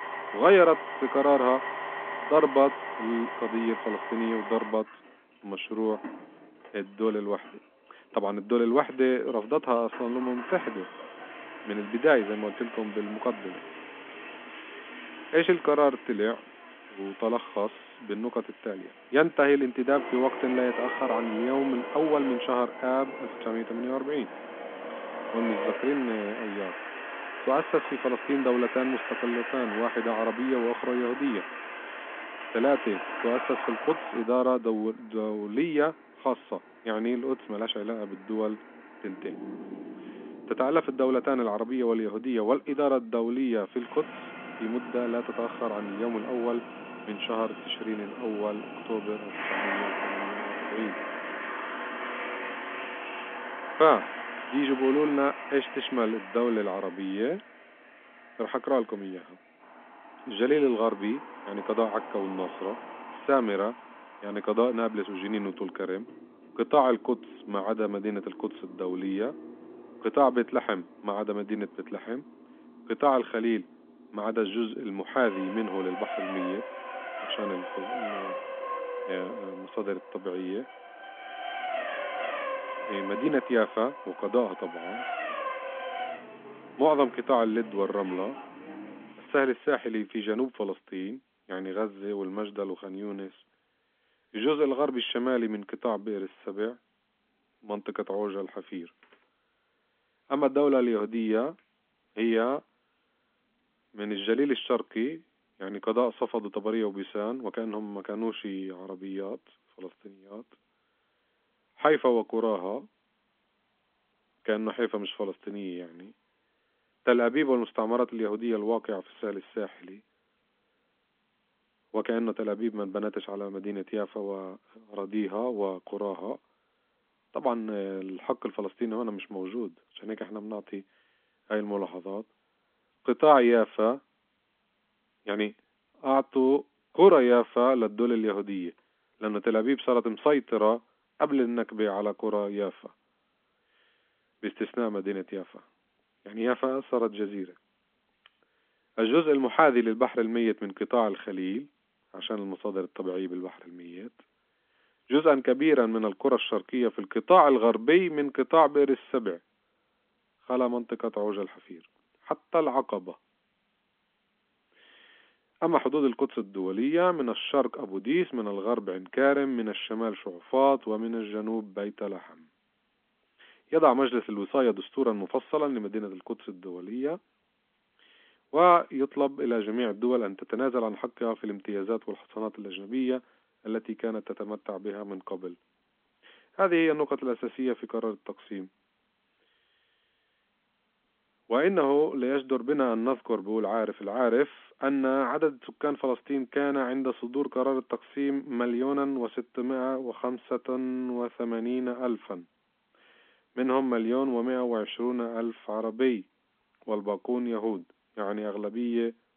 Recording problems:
phone-call audio; nothing above 3.5 kHz
traffic noise; loud; until 1:29; 9 dB below the speech

